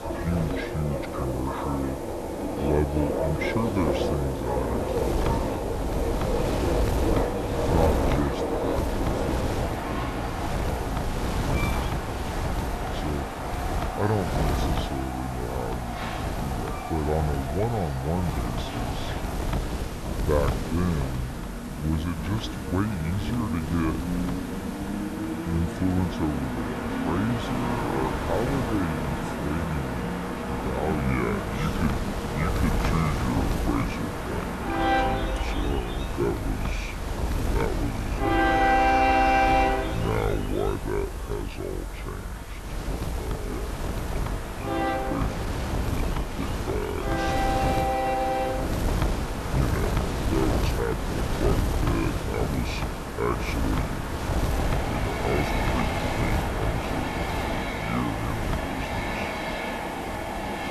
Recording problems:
wrong speed and pitch; too slow and too low; 0.7 times normal speed
train or aircraft noise; very loud; throughout; 1 dB above the speech
wind noise on the microphone; heavy; 2 dB below the speech
hiss; noticeable; throughout; 15 dB below the speech

